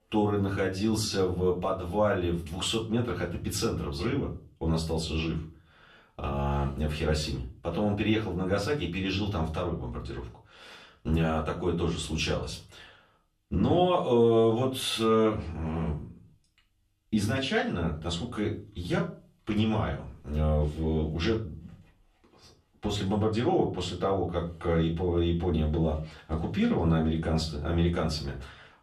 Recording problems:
off-mic speech; far
room echo; slight; dies away in 0.3 s

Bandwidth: 13.5 kHz